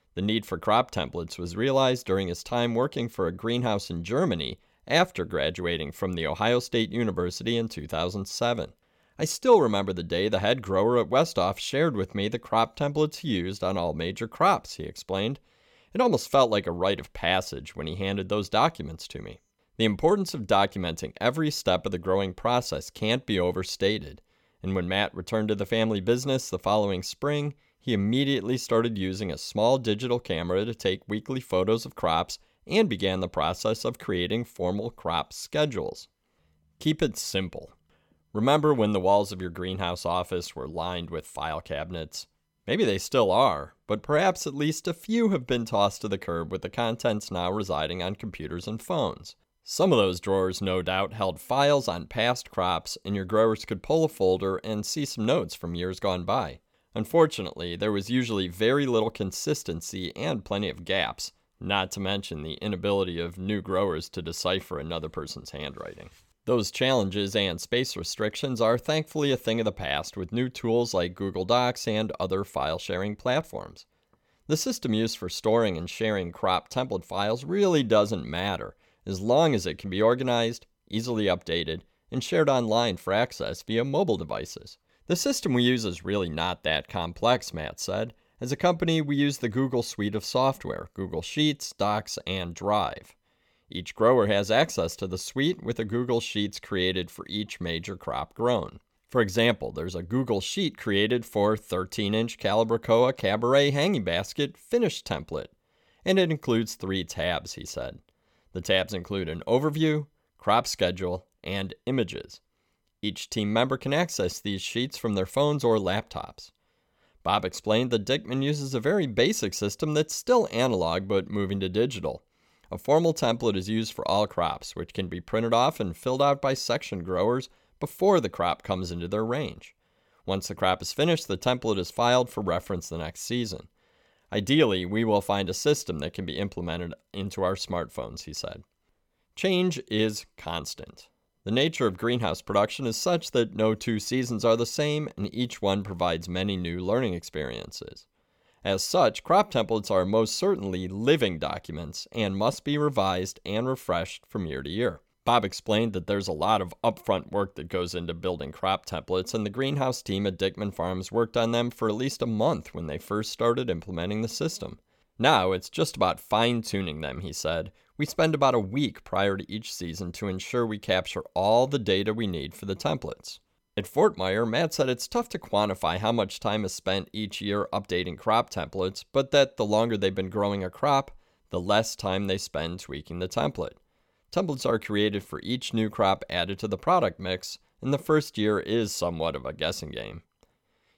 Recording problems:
none

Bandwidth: 17 kHz